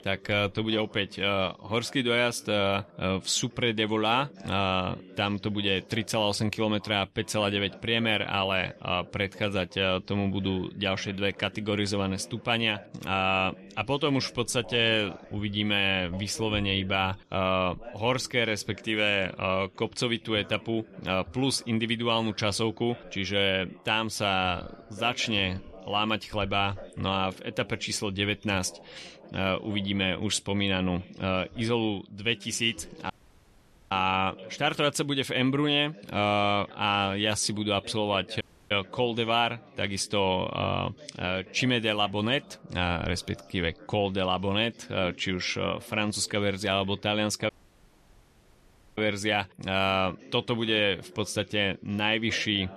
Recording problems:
background chatter; faint; throughout; 4 voices, 20 dB below the speech
audio cutting out; at 33 s for 1 s, at 38 s and at 47 s for 1.5 s

